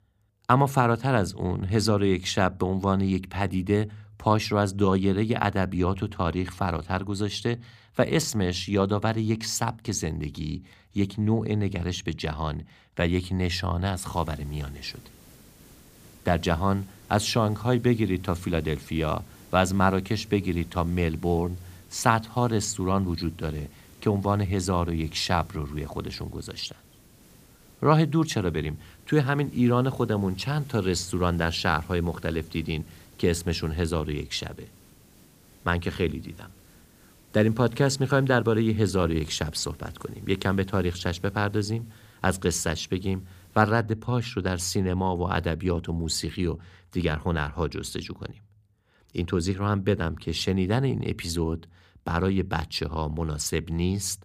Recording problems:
hiss; faint; from 14 to 44 s; 25 dB below the speech

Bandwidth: 15 kHz